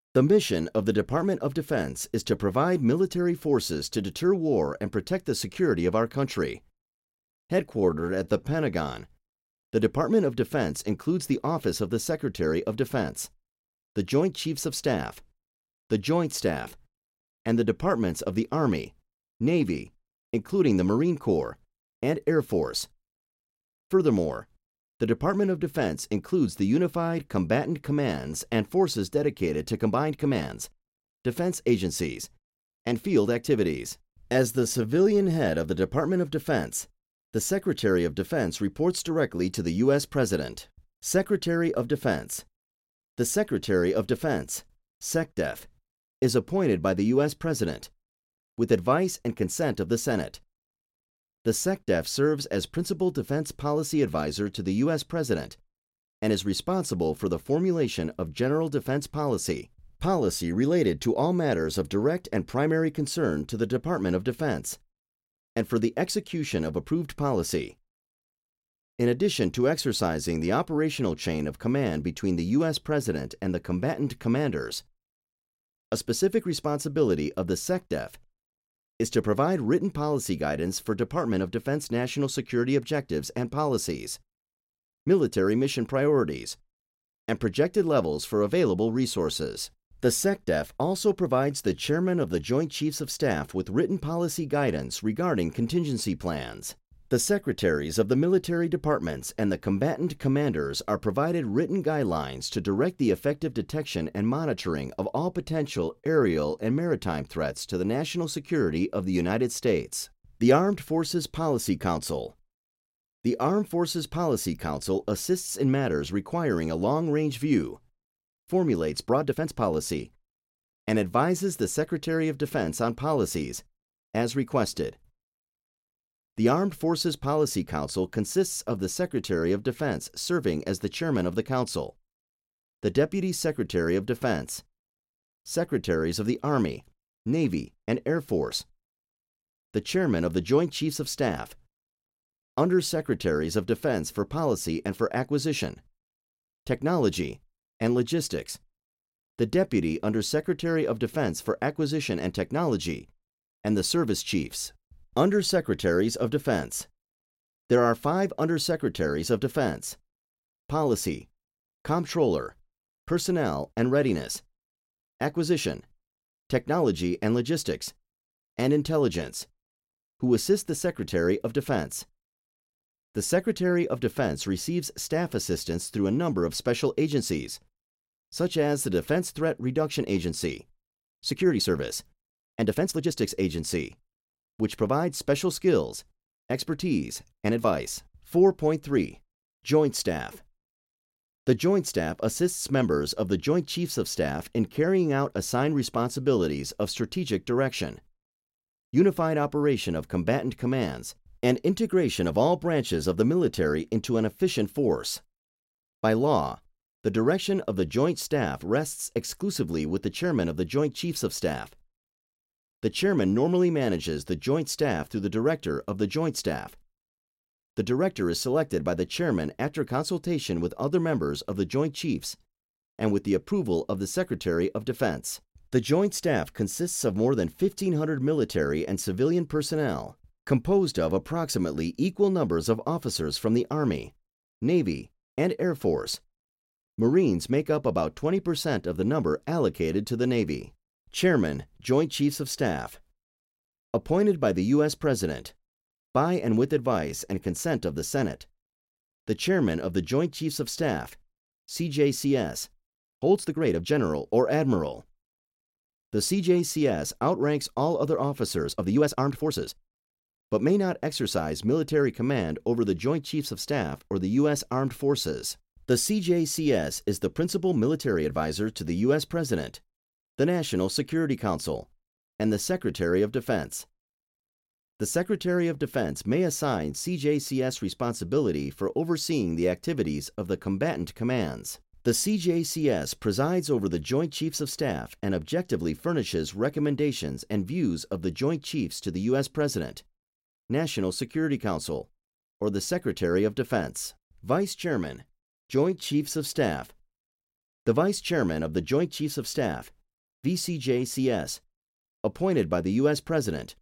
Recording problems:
uneven, jittery; strongly; from 7.5 s to 4:57

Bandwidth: 16 kHz